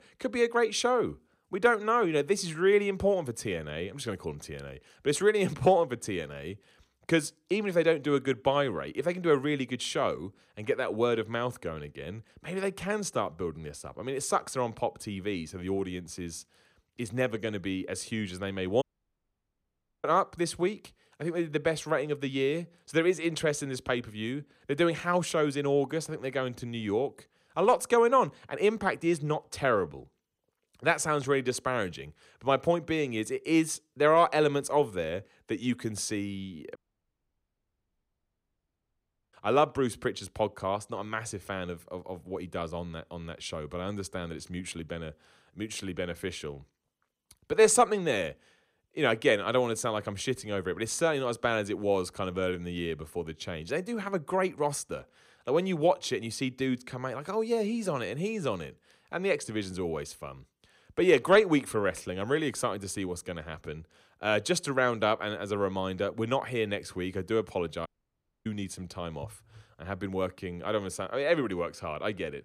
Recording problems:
audio cutting out; at 19 s for 1 s, at 37 s for 2.5 s and at 1:08 for 0.5 s

